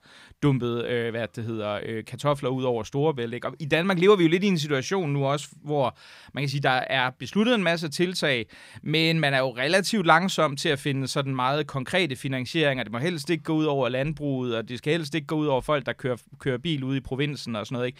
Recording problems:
none

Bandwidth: 15.5 kHz